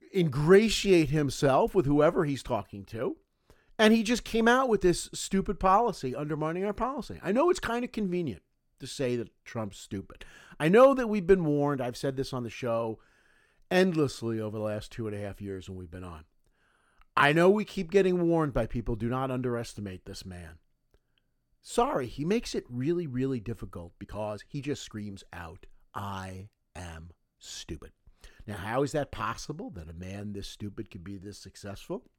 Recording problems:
uneven, jittery; strongly; from 0.5 to 31 s

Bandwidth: 17 kHz